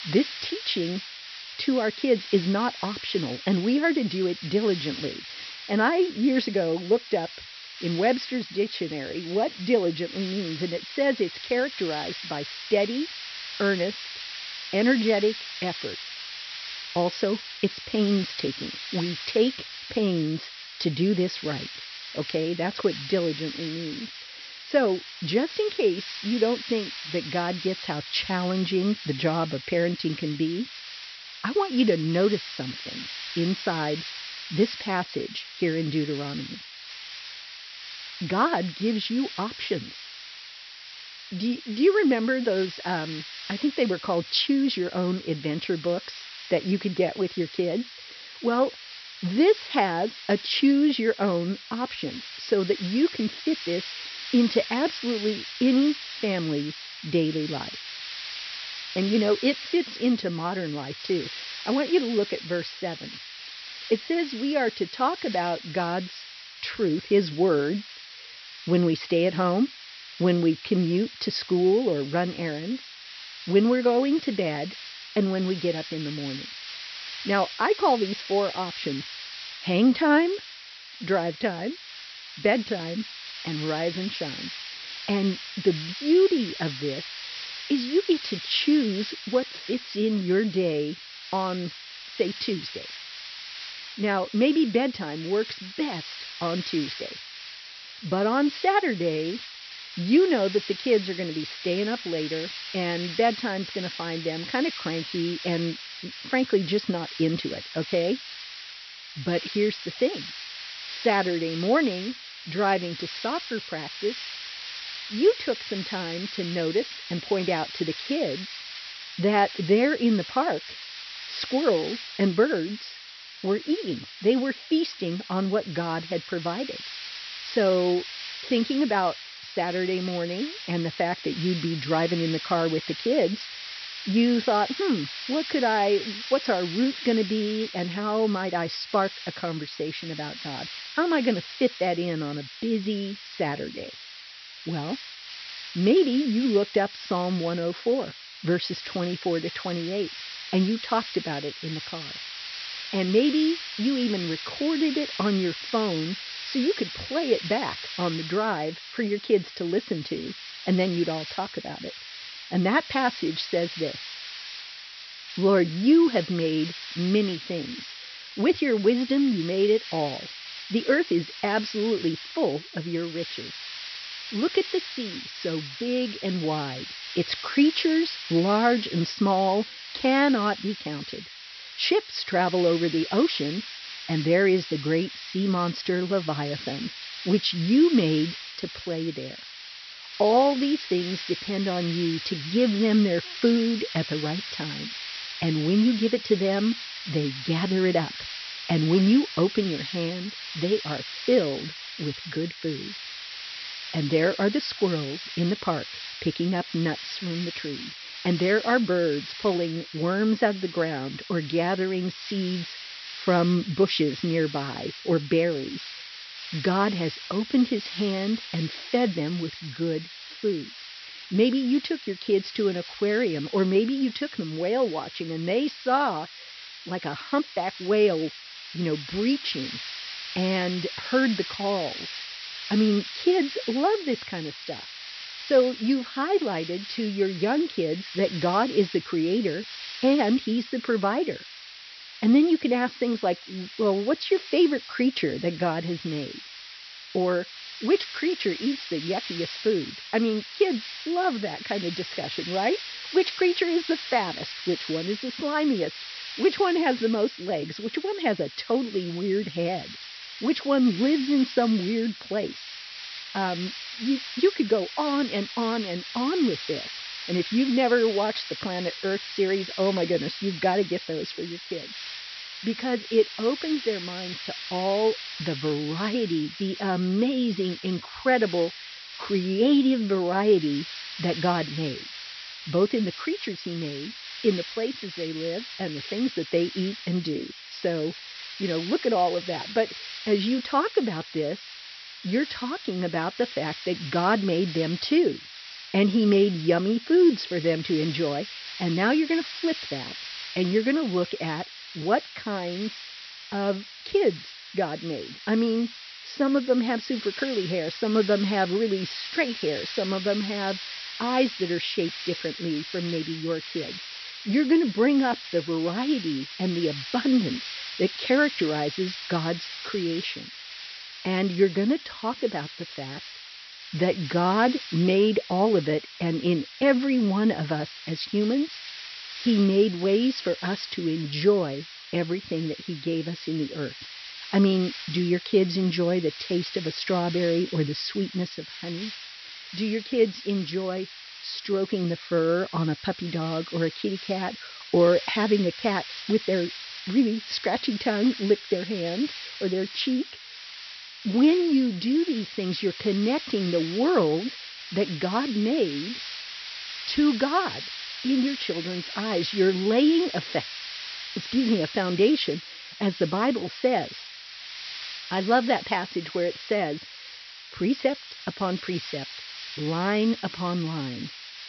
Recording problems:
high frequencies cut off; noticeable; nothing above 5.5 kHz
hiss; noticeable; throughout; 10 dB below the speech

